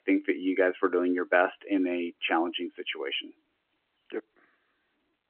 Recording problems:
phone-call audio; nothing above 3 kHz

